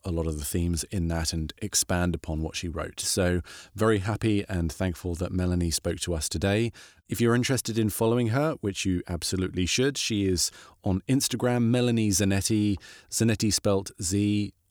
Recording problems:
none

